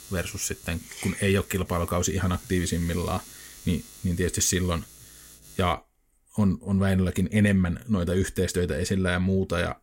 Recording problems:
electrical hum; noticeable; until 5.5 s; 60 Hz, 20 dB below the speech

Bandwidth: 16 kHz